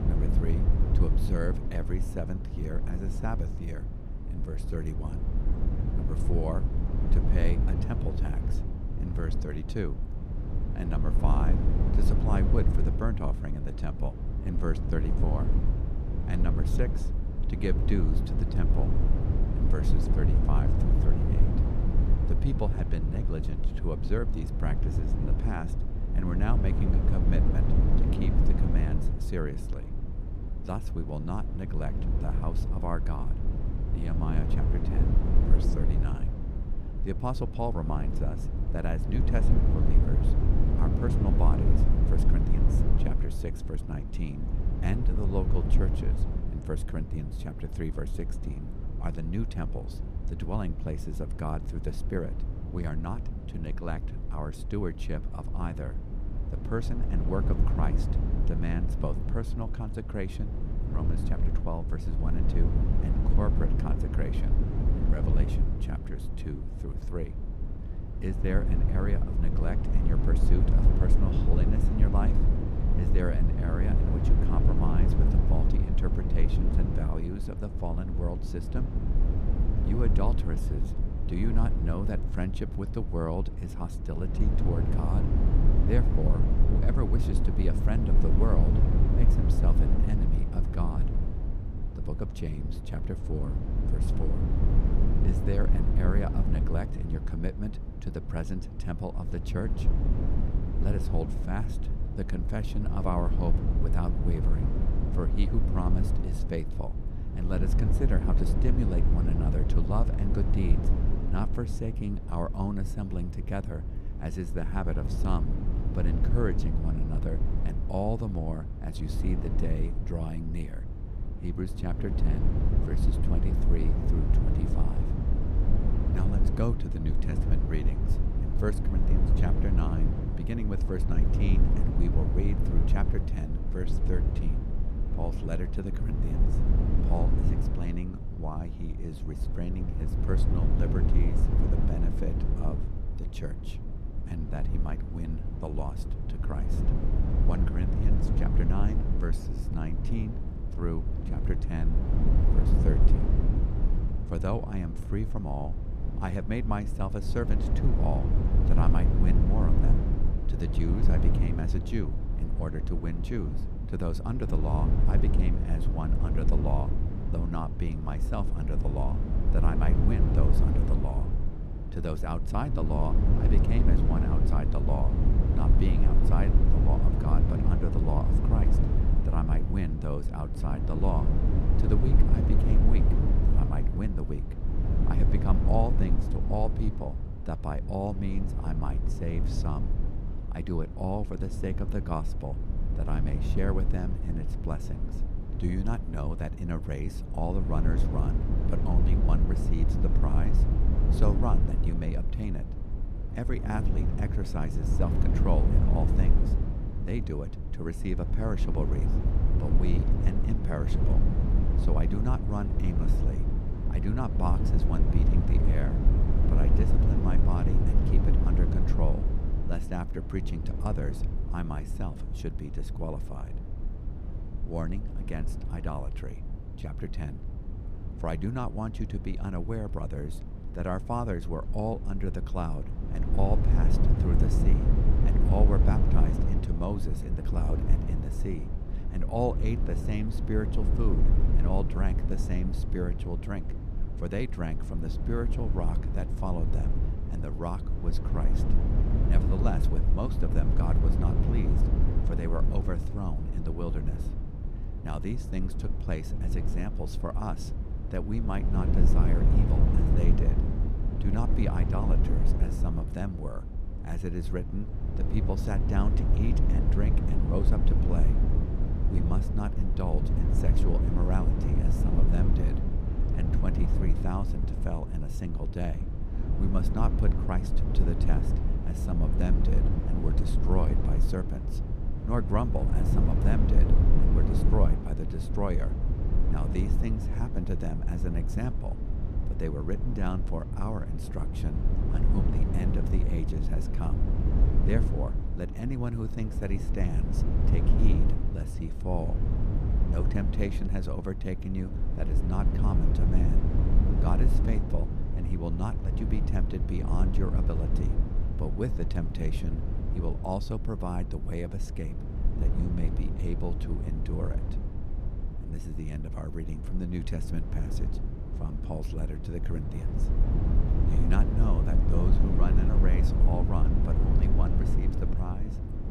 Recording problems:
low rumble; loud; throughout; 3 dB below the speech

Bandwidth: 14.5 kHz